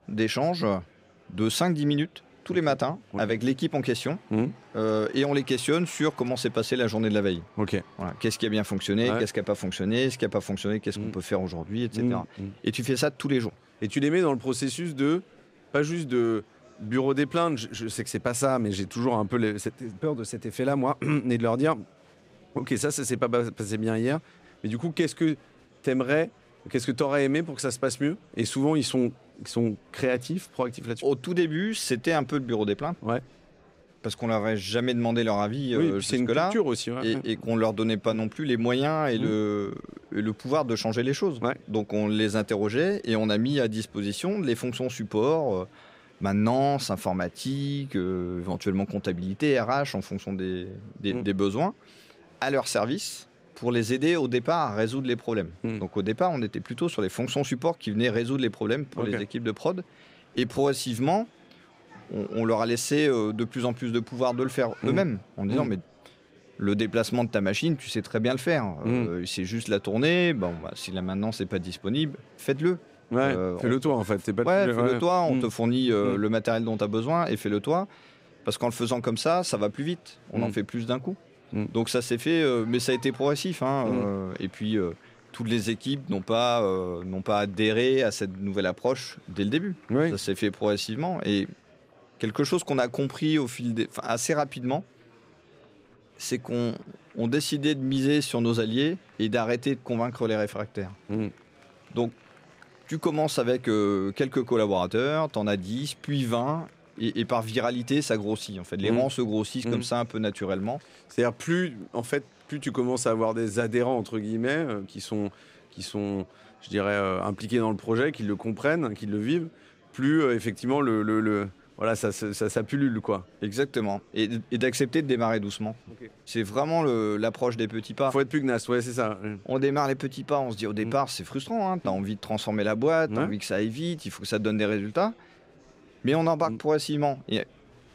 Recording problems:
murmuring crowd; faint; throughout; 30 dB below the speech

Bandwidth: 15.5 kHz